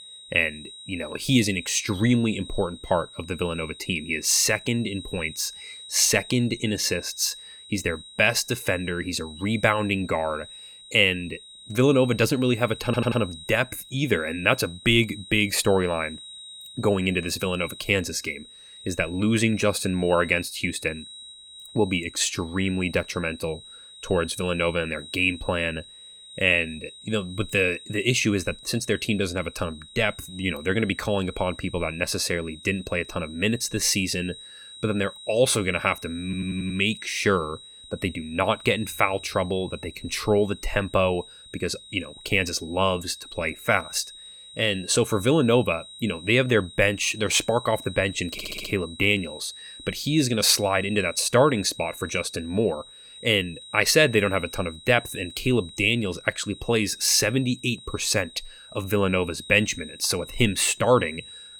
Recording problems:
high-pitched whine; noticeable; throughout; 4 kHz, 15 dB below the speech
audio stuttering; at 13 s, at 36 s and at 48 s

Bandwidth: 18.5 kHz